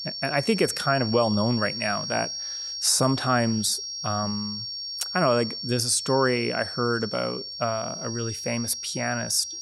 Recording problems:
high-pitched whine; loud; throughout; 5.5 kHz, 6 dB below the speech

